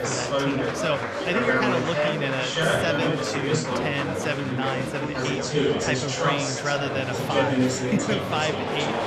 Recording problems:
chatter from many people; very loud; throughout; 4 dB above the speech

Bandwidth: 15.5 kHz